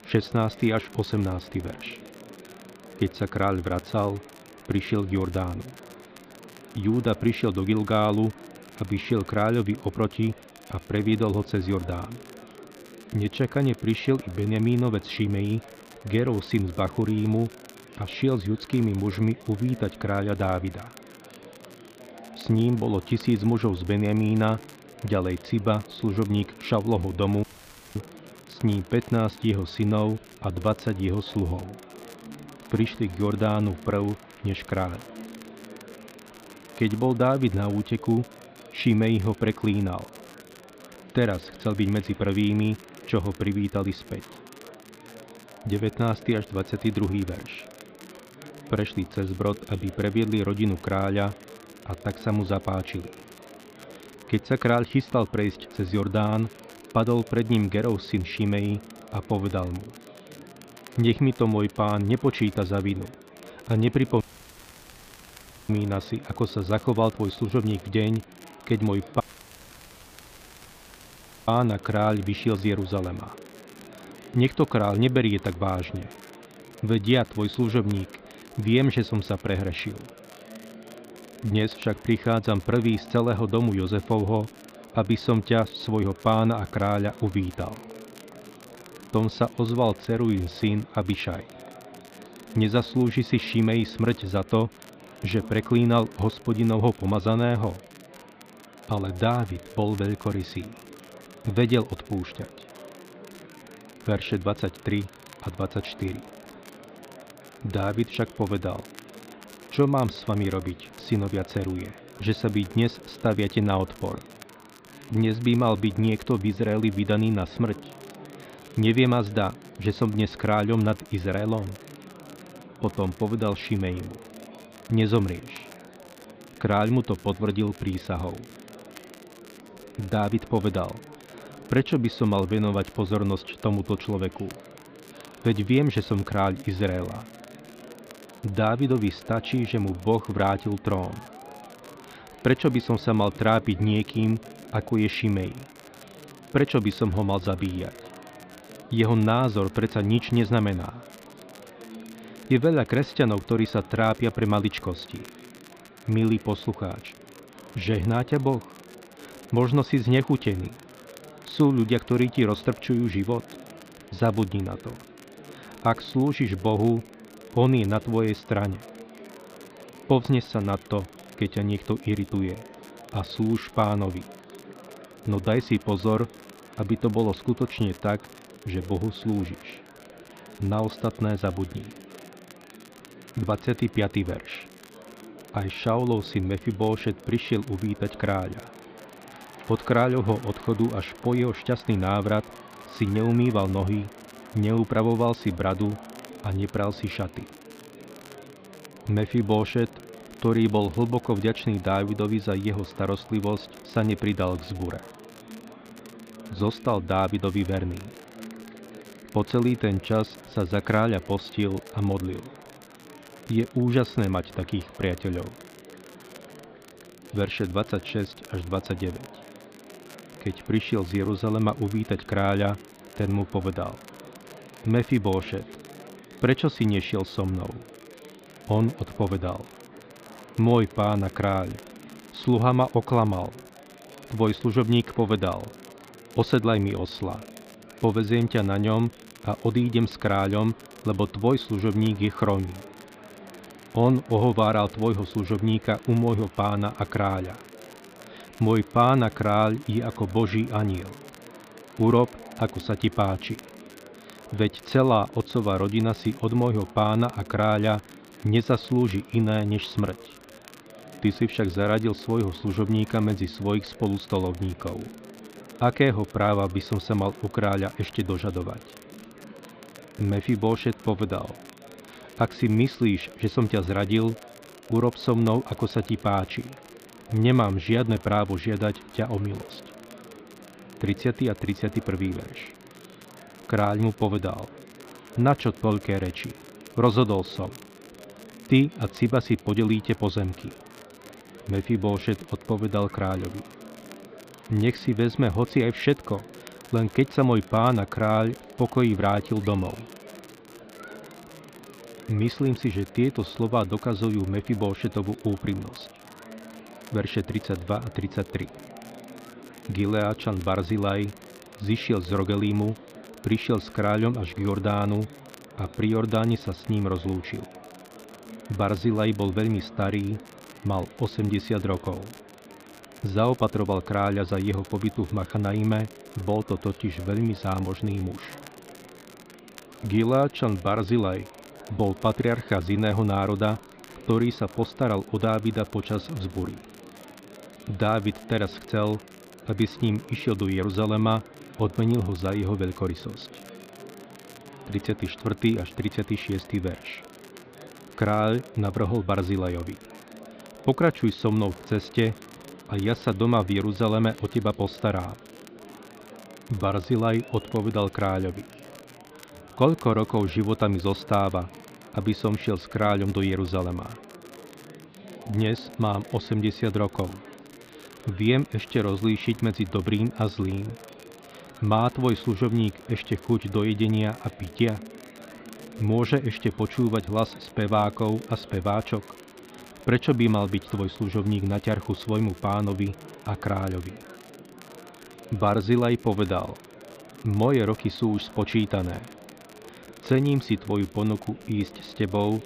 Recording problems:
muffled; slightly; fading above 4 kHz
murmuring crowd; faint; throughout; 20 dB below the speech
crackle, like an old record; faint; 25 dB below the speech
audio cutting out; at 27 s for 0.5 s, at 1:04 for 1.5 s and at 1:09 for 2.5 s

